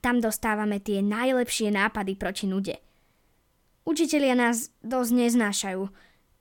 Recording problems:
none

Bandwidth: 17 kHz